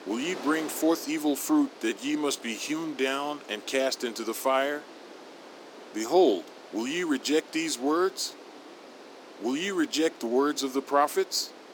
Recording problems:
thin; somewhat; fading below 300 Hz
wind noise on the microphone; occasional gusts; 15 dB below the speech

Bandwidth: 17 kHz